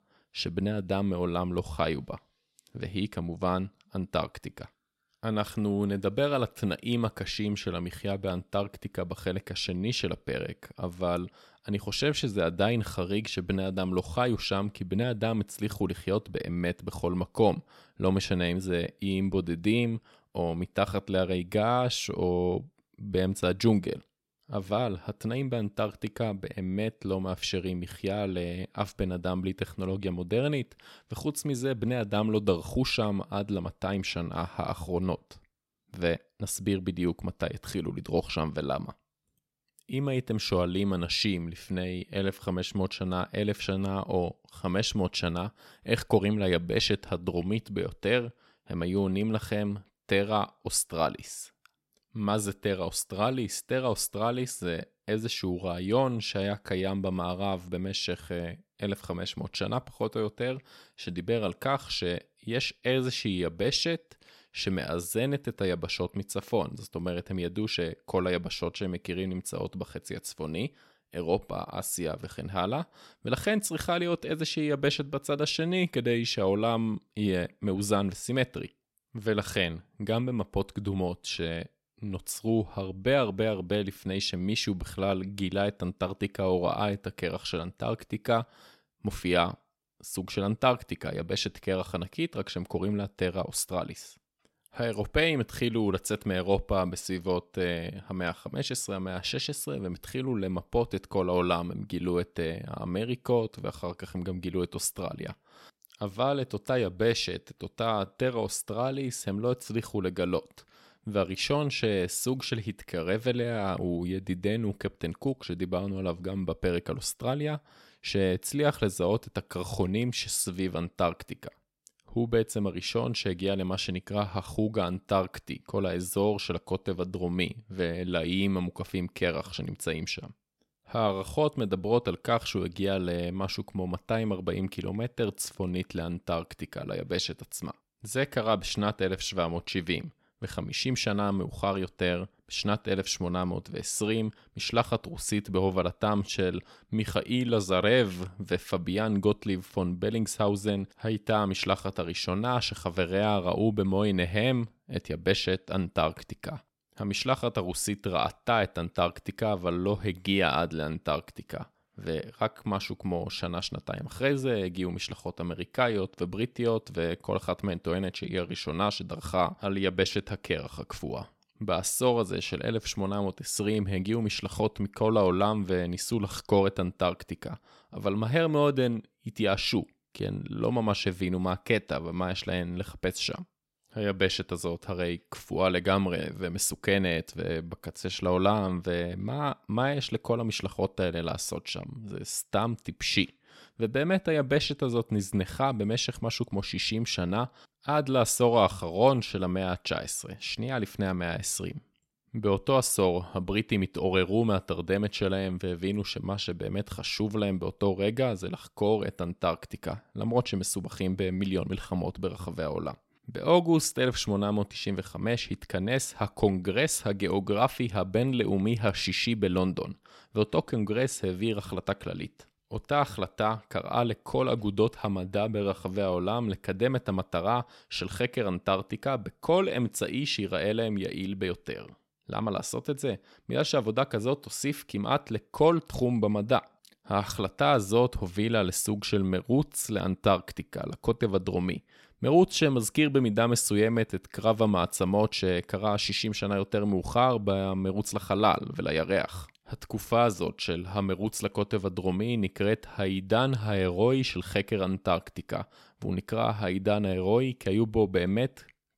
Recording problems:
none

